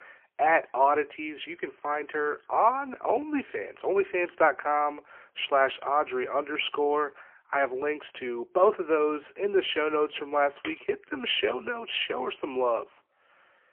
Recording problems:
phone-call audio; poor line; nothing above 3 kHz

